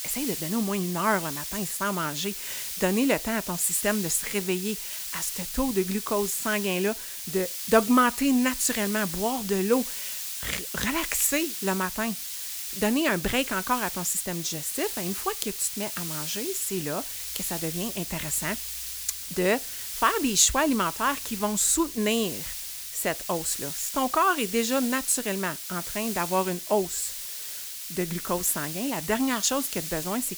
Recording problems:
hiss; loud; throughout; 6 dB below the speech

